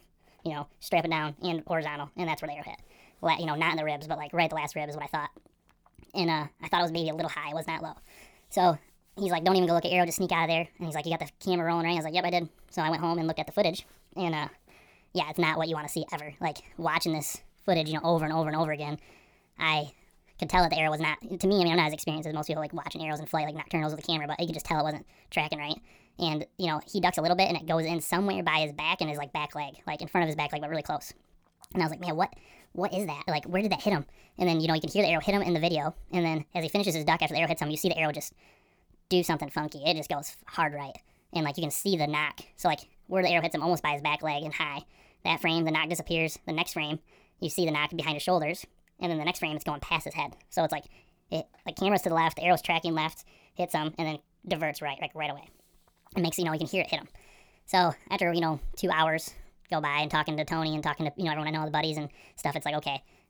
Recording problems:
wrong speed and pitch; too fast and too high; 1.5 times normal speed

